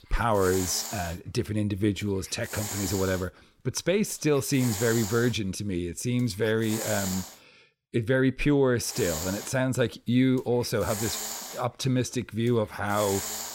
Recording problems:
hiss; loud; until 7.5 s and from 9 s on; 7 dB below the speech

